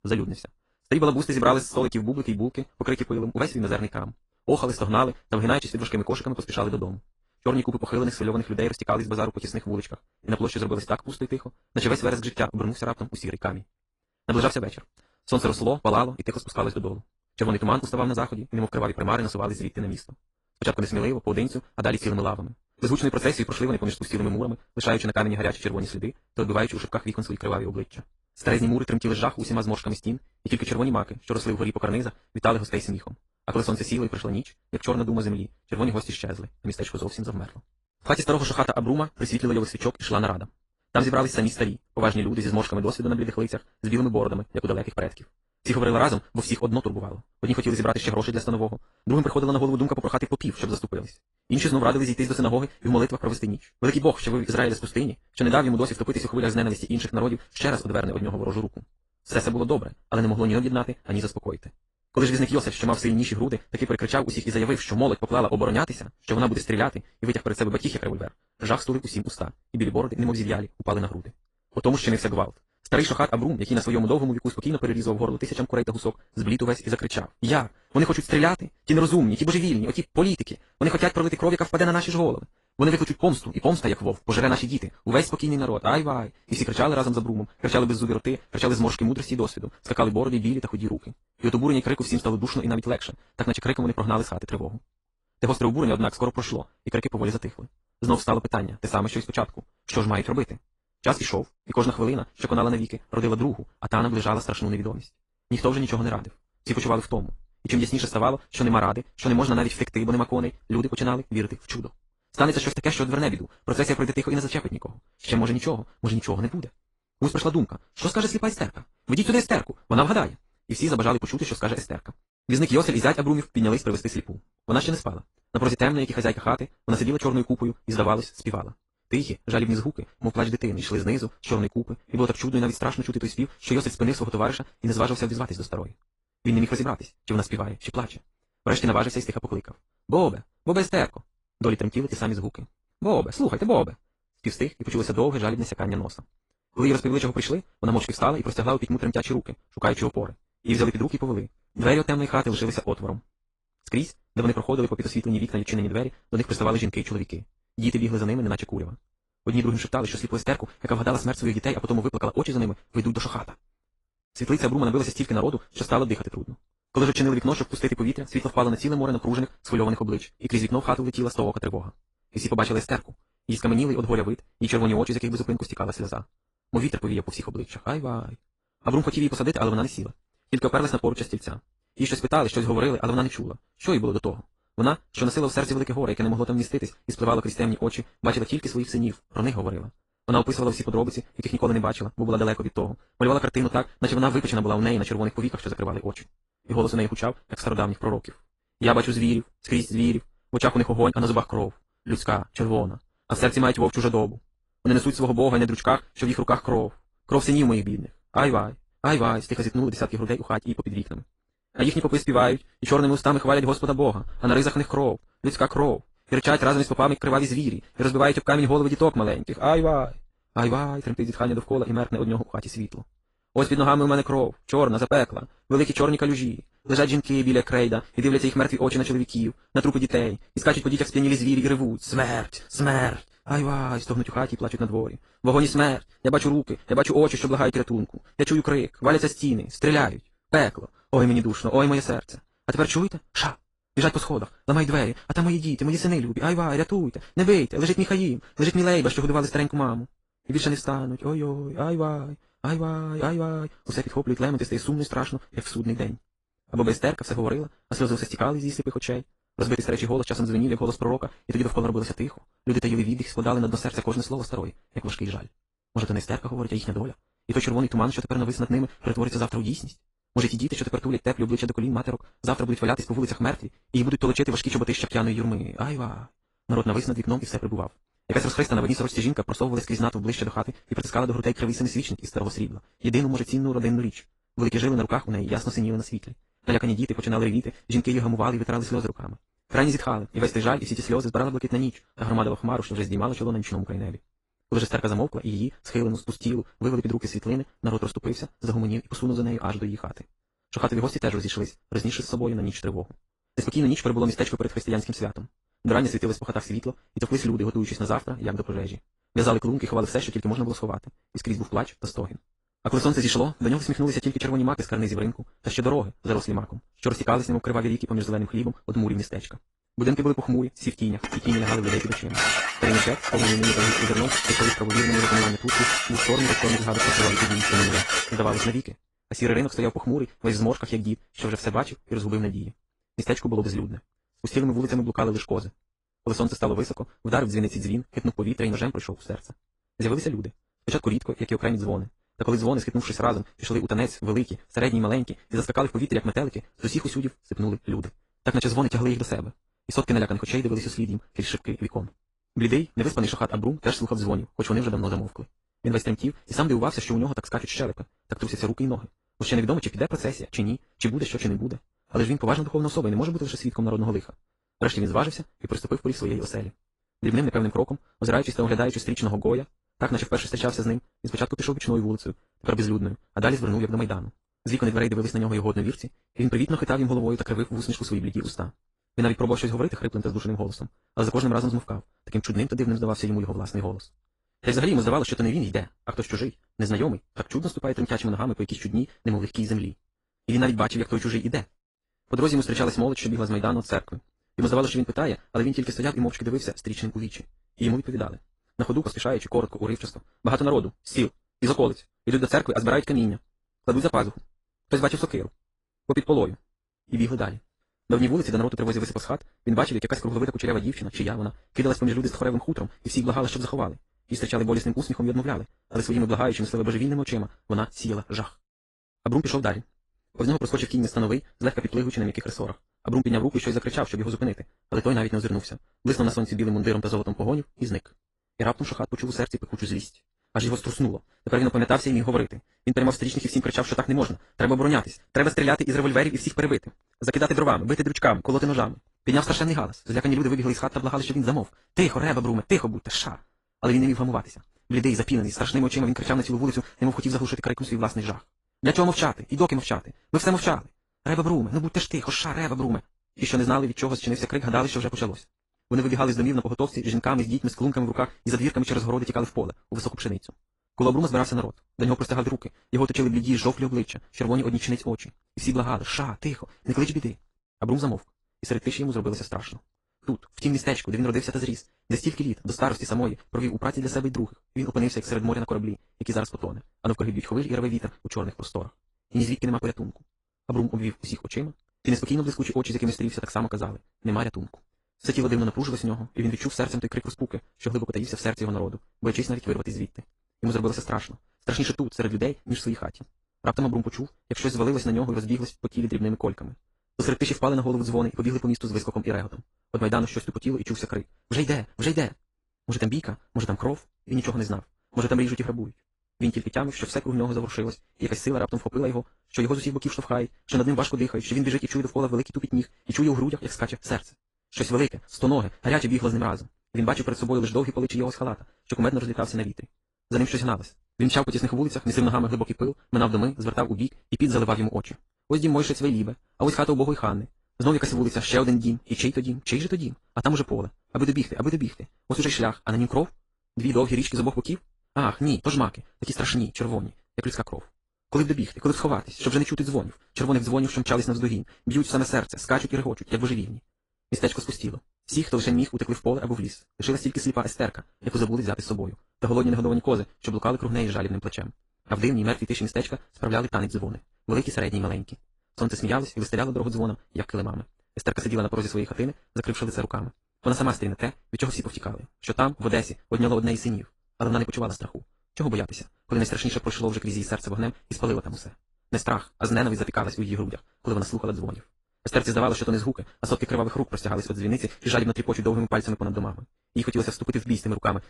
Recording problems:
wrong speed, natural pitch; too fast; 1.8 times normal speed
garbled, watery; slightly
clattering dishes; loud; from 5:21 to 5:29; peak 6 dB above the speech

